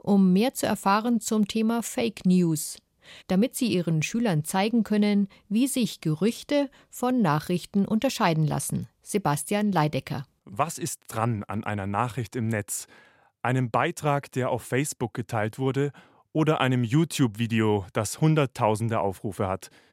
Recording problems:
none

